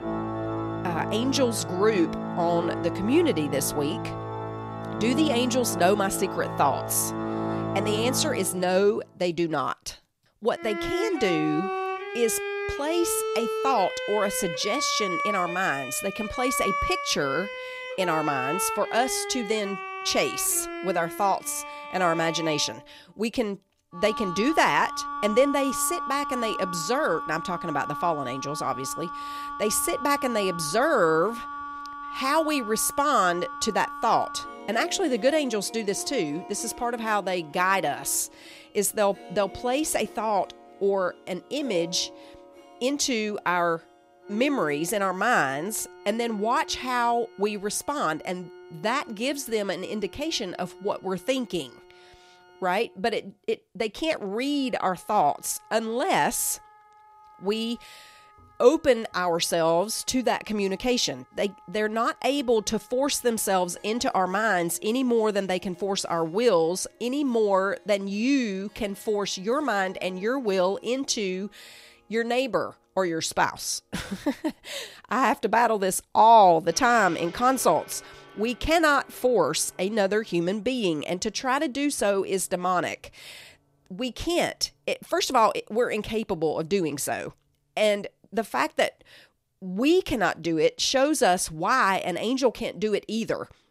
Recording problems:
background music; loud; throughout; 8 dB below the speech

